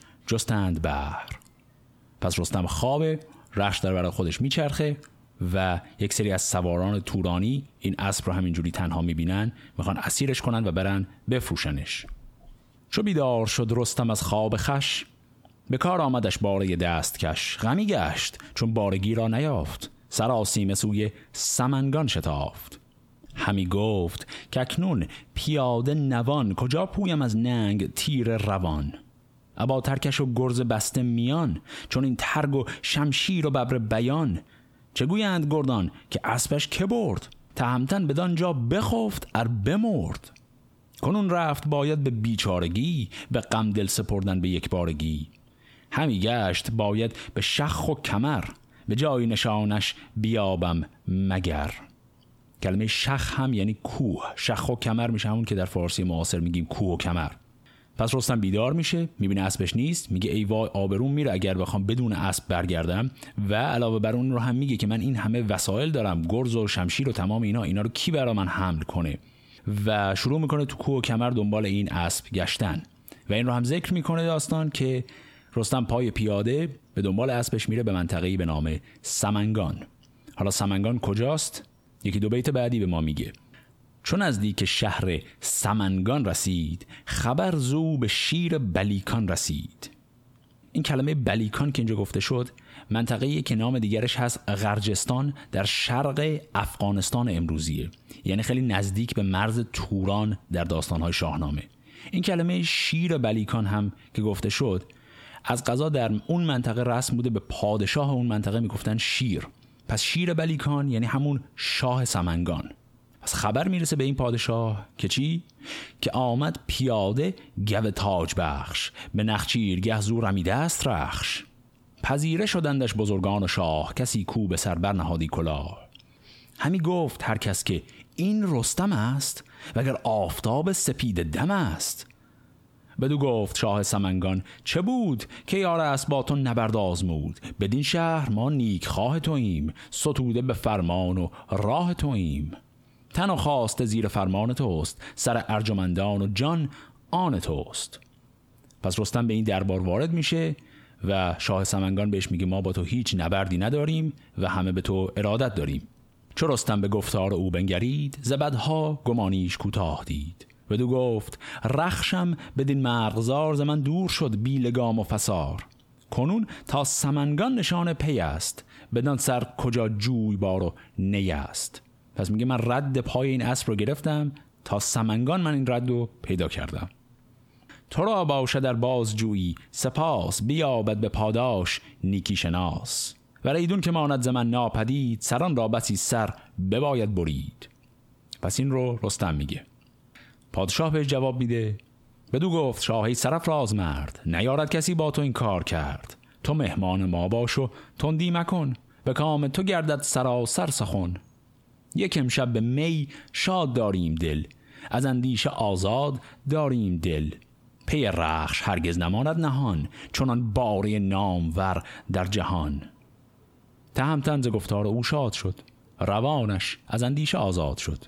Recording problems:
squashed, flat; heavily

